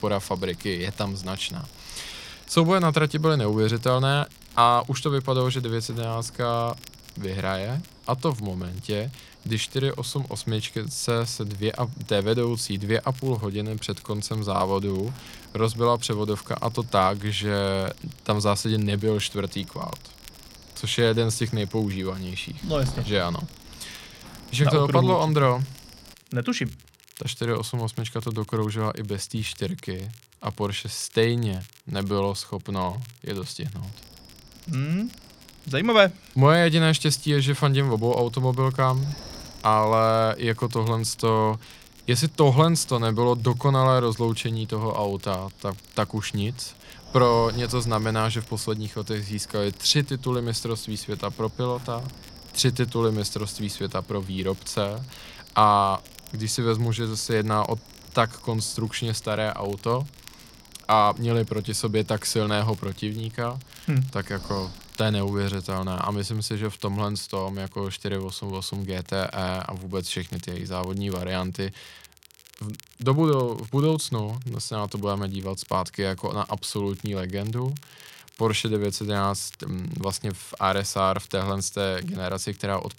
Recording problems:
wind noise on the microphone; occasional gusts; until 26 s and from 34 s to 1:06; 20 dB below the speech
crackle, like an old record; faint; 25 dB below the speech

